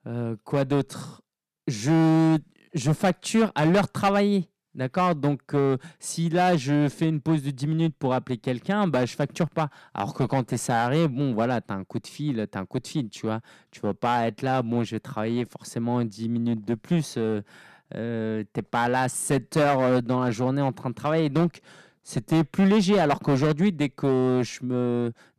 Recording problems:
distortion; slight; 7% of the sound clipped

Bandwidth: 14 kHz